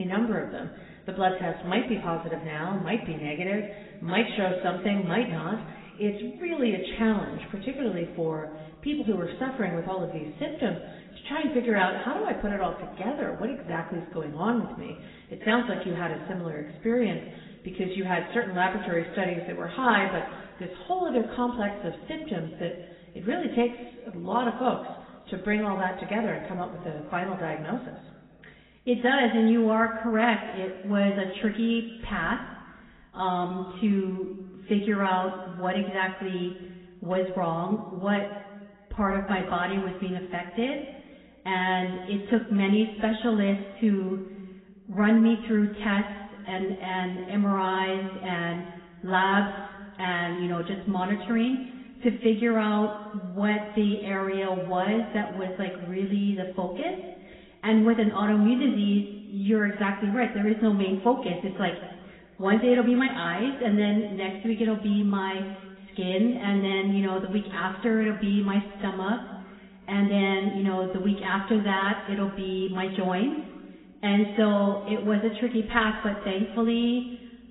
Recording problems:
garbled, watery; badly; nothing above 3.5 kHz
room echo; slight; dies away in 1.5 s
off-mic speech; somewhat distant
abrupt cut into speech; at the start

